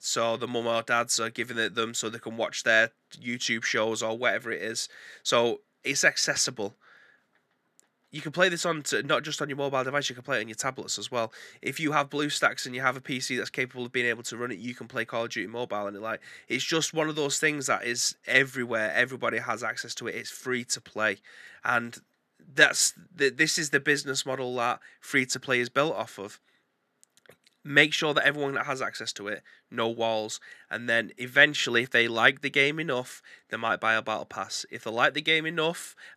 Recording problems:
thin; very slightly; fading below 250 Hz

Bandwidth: 14.5 kHz